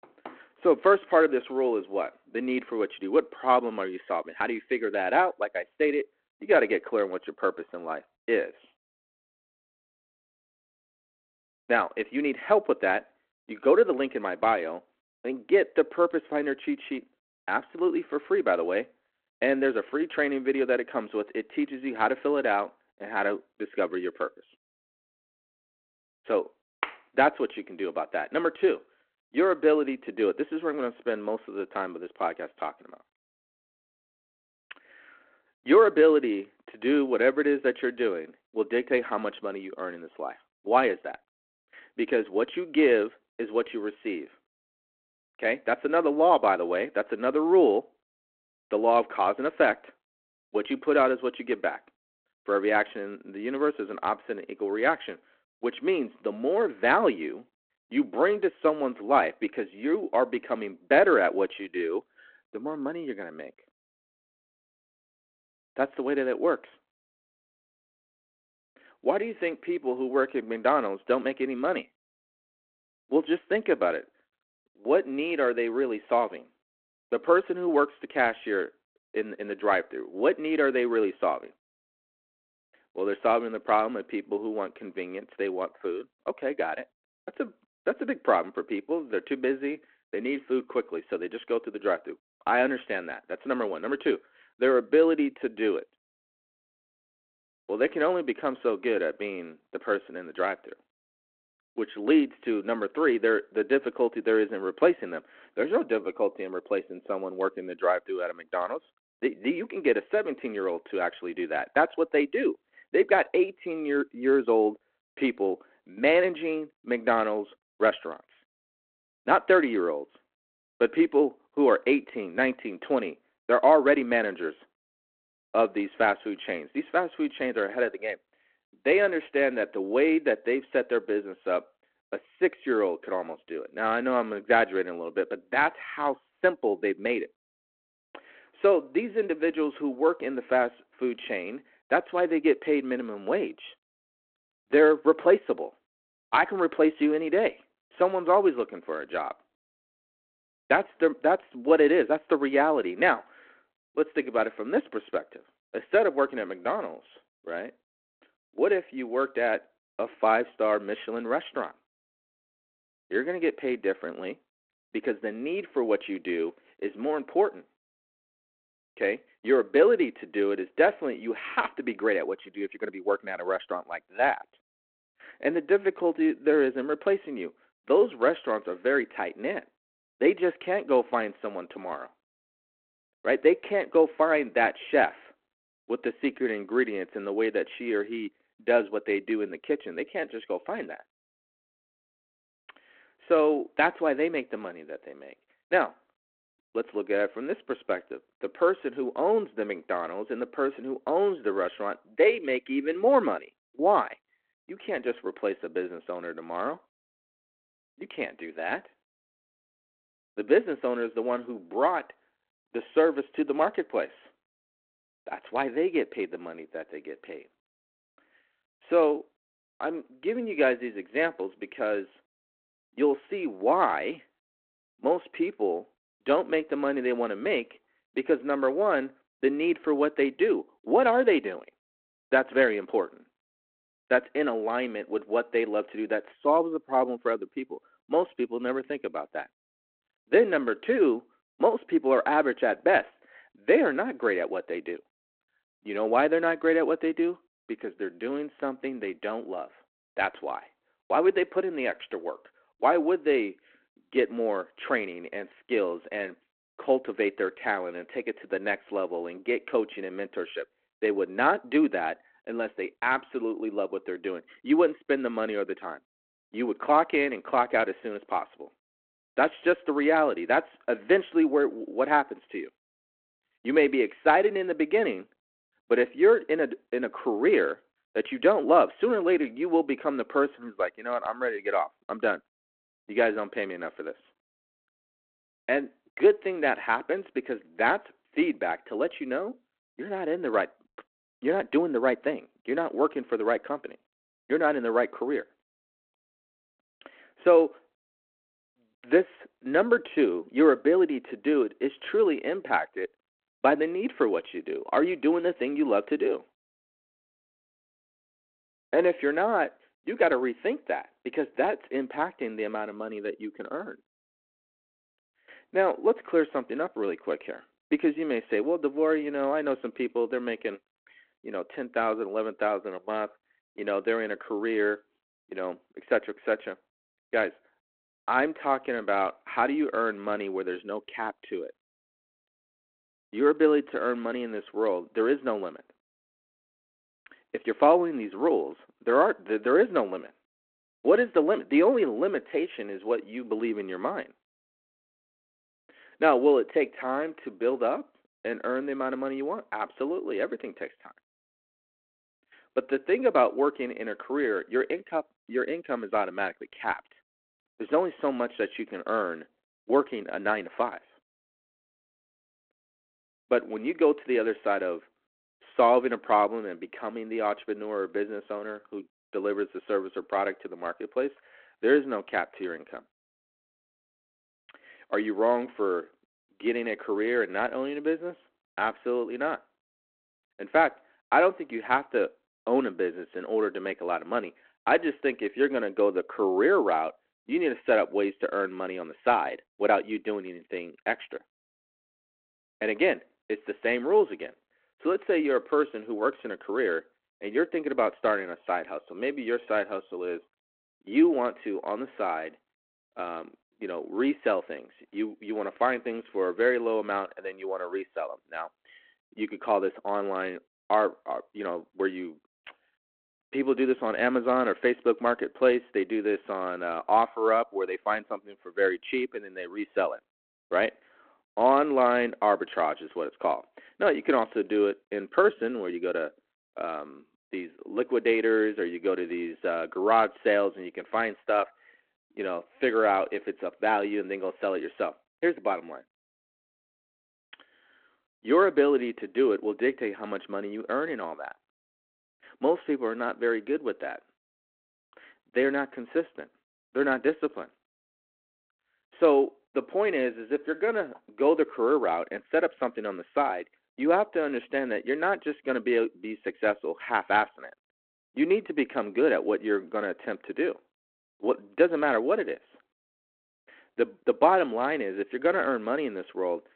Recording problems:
phone-call audio; nothing above 4 kHz

